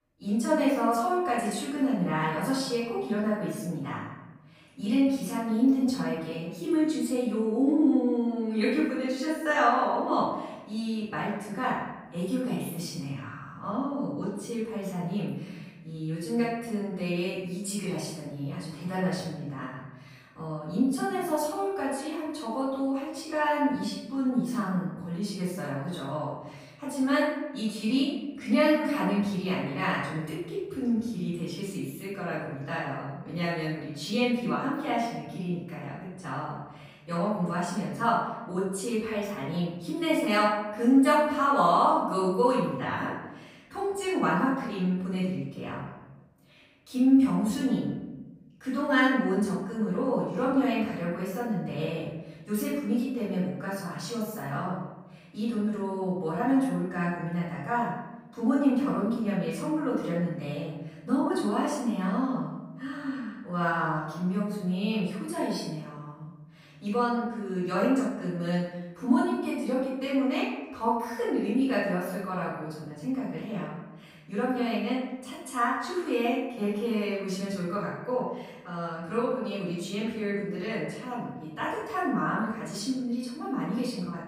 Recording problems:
off-mic speech; far
room echo; noticeable; dies away in 1 s

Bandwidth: 15.5 kHz